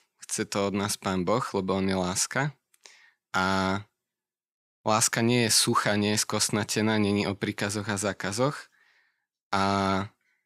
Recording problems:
none

